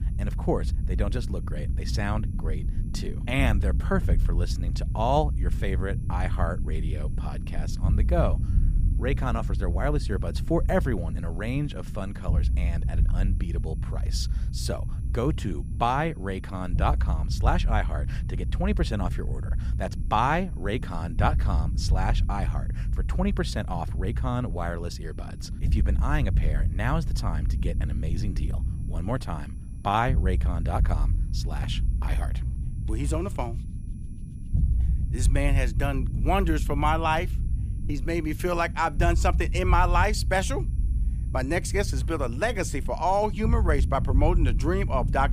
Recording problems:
low rumble; noticeable; throughout; 15 dB below the speech
high-pitched whine; faint; throughout; 11 kHz, 35 dB below the speech

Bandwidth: 15 kHz